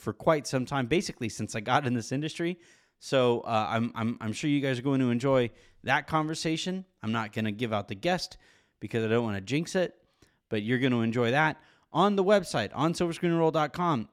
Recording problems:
none

